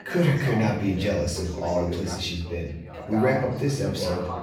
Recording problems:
off-mic speech; far
room echo; noticeable; dies away in 0.6 s
background chatter; loud; throughout; 3 voices, 9 dB below the speech

